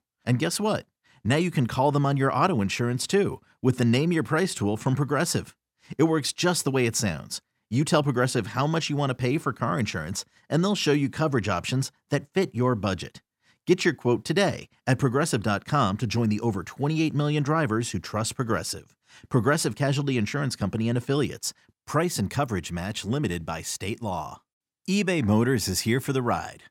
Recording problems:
none

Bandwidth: 16.5 kHz